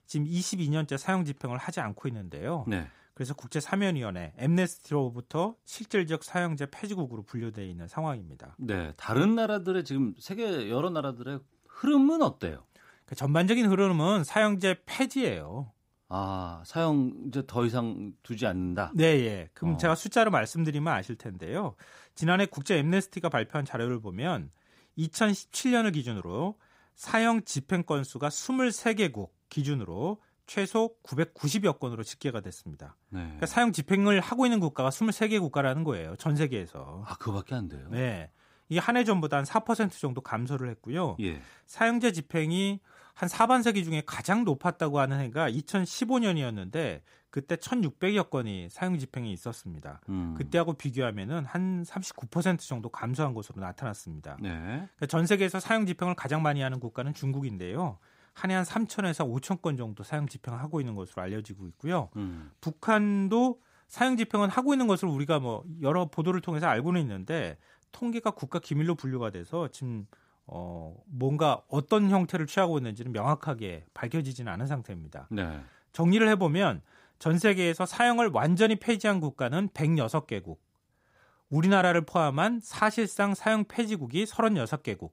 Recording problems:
none

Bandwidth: 15.5 kHz